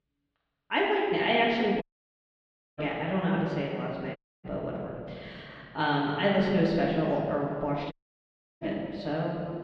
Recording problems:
off-mic speech; far
room echo; noticeable; dies away in 2.1 s
muffled; slightly; fading above 3.5 kHz
audio cutting out; at 2 s for 1 s, at 4 s and at 8 s for 0.5 s

